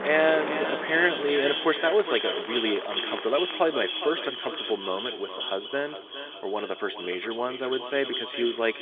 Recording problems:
echo of what is said; strong; throughout; 410 ms later, 5 dB below the speech
phone-call audio; nothing above 3.5 kHz
traffic noise; loud; throughout; 10 dB below the speech
rain or running water; noticeable; throughout; 15 dB below the speech

